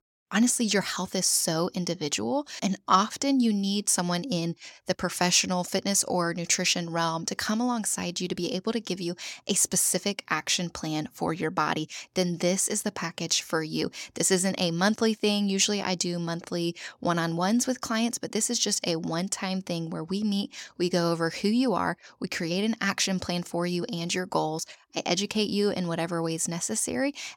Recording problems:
none

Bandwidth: 17 kHz